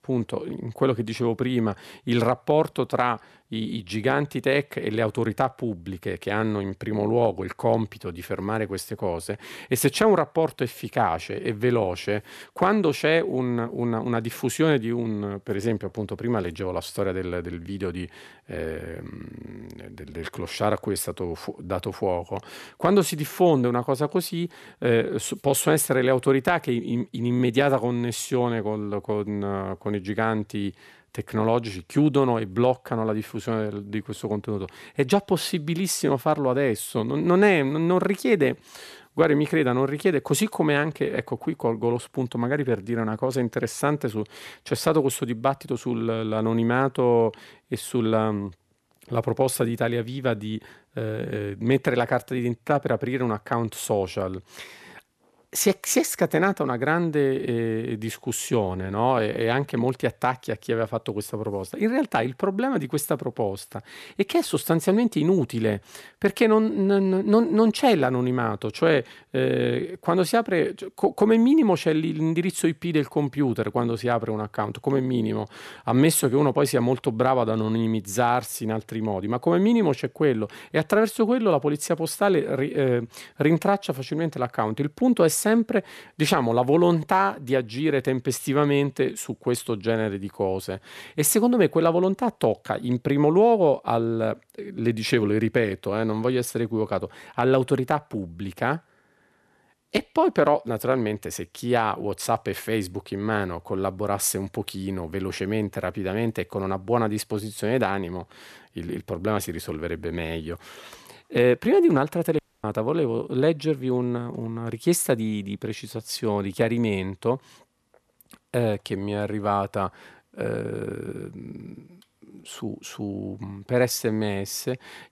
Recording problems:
audio cutting out; at 1:52

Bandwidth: 14 kHz